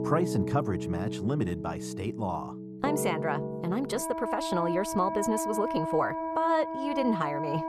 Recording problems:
muffled; slightly; fading above 1.5 kHz
background music; loud; throughout; 3 dB below the speech

